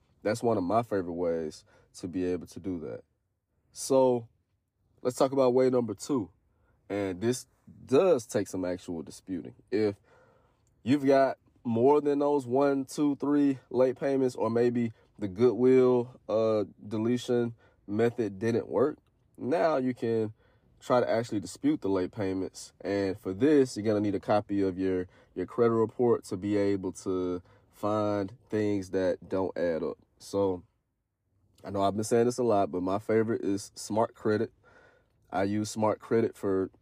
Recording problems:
none

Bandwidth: 15 kHz